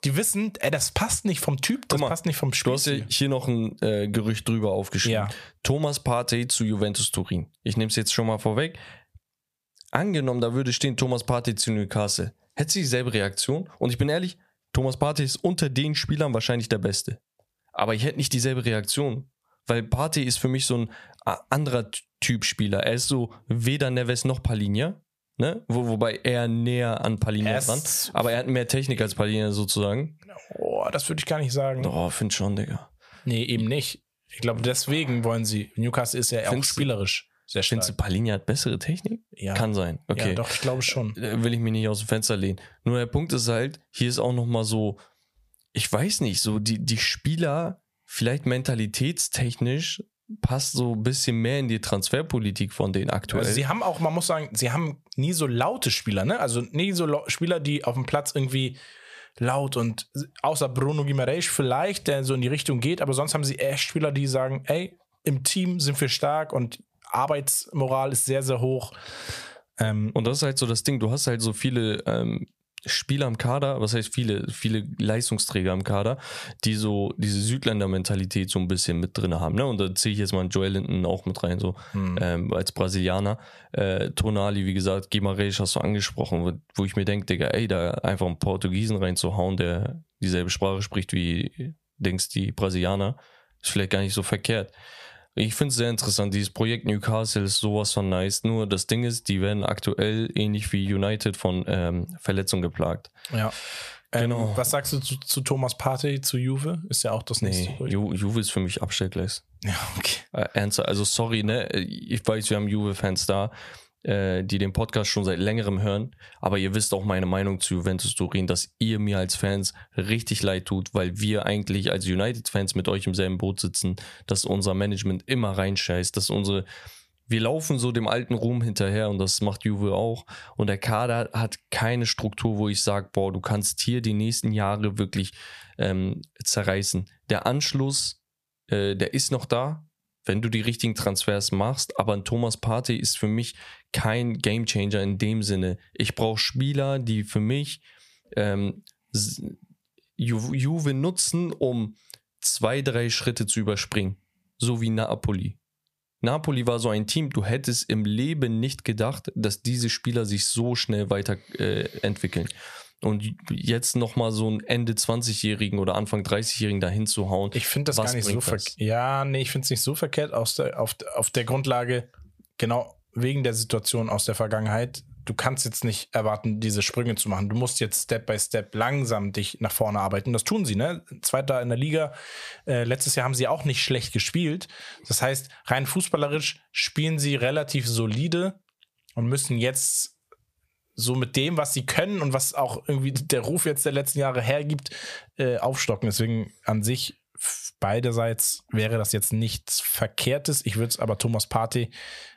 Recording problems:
squashed, flat; somewhat

